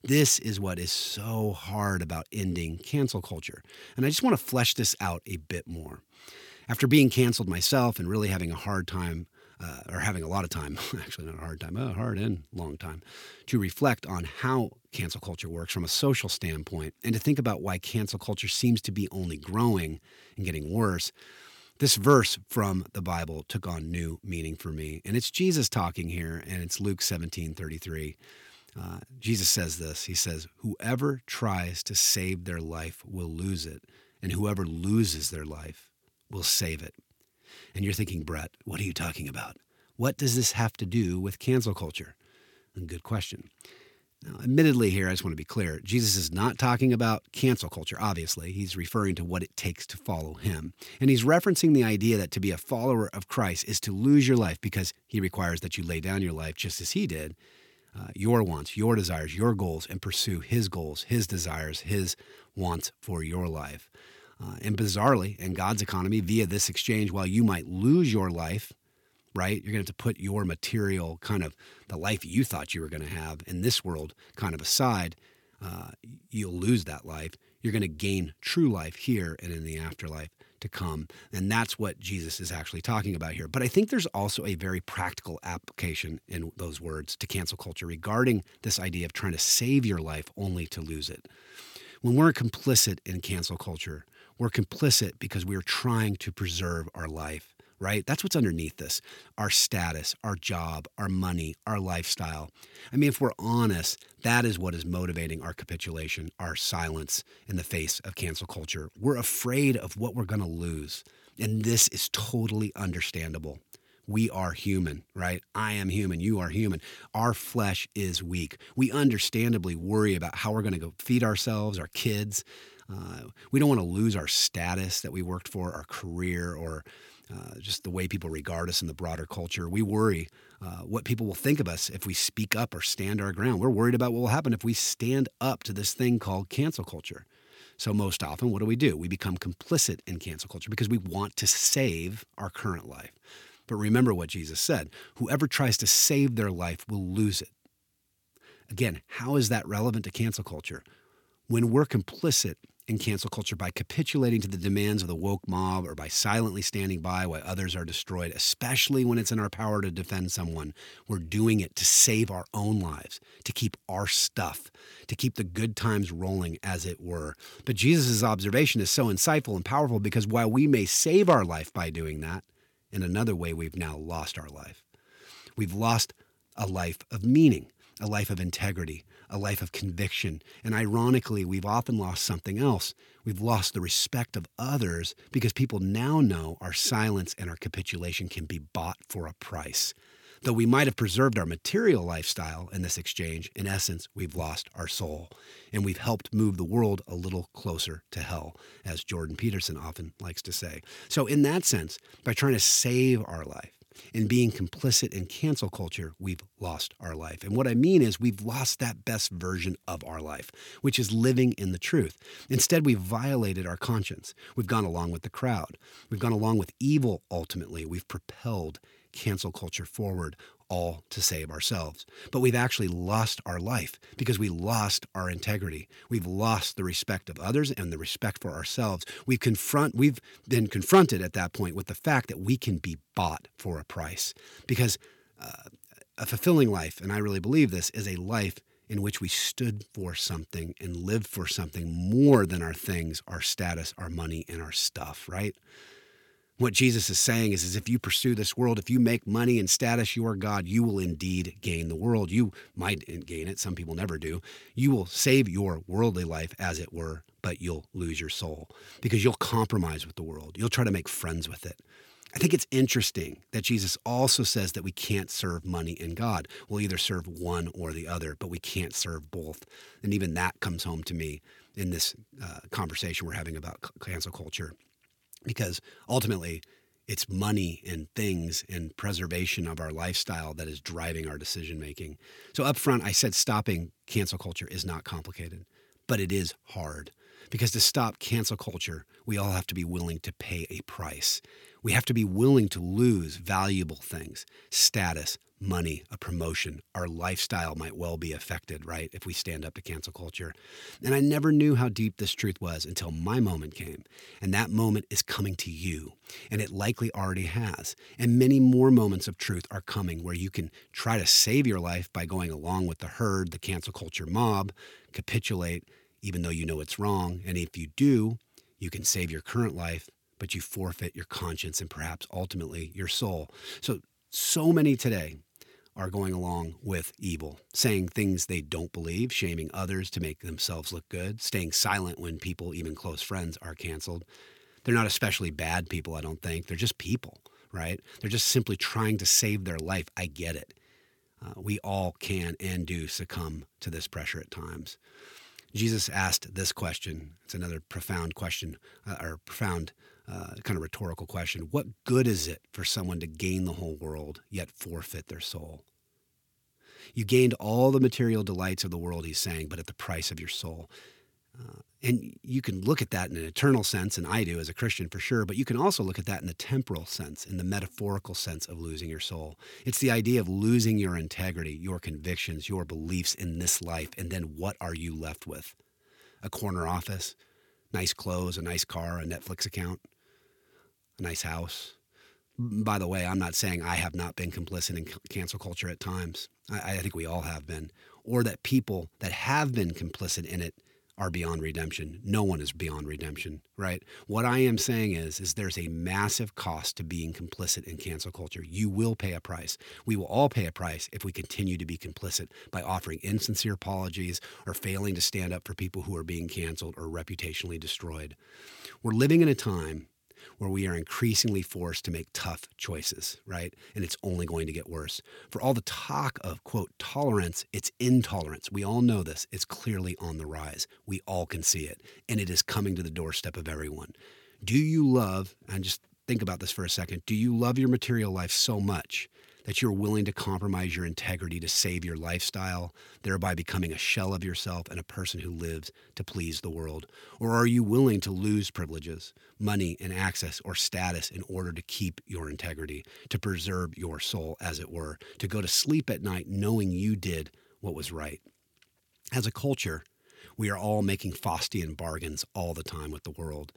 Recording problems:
none

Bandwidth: 17 kHz